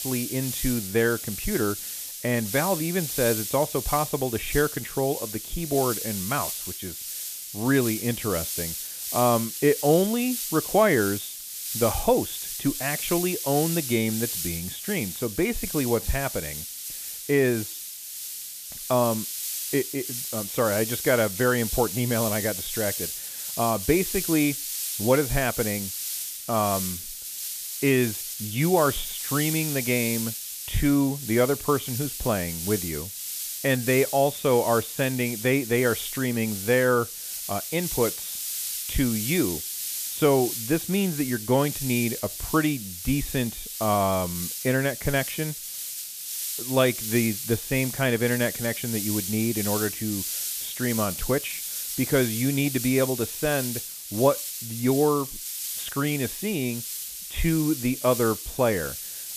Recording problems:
high frequencies cut off; severe; nothing above 3.5 kHz
hiss; loud; throughout; 5 dB below the speech

